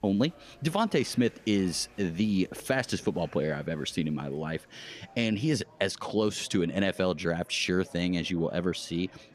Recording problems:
murmuring crowd; faint; throughout; 25 dB below the speech

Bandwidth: 14.5 kHz